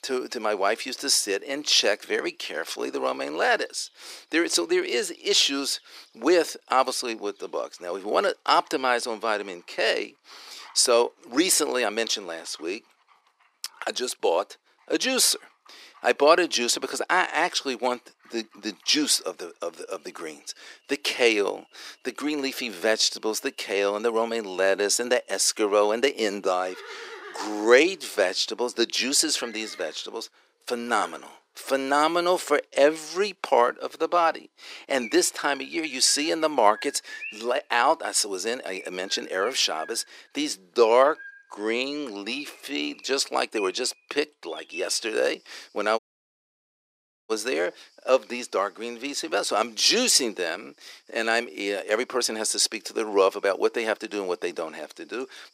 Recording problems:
thin; very; fading below 400 Hz
animal sounds; faint; throughout; 20 dB below the speech
audio cutting out; at 46 s for 1.5 s

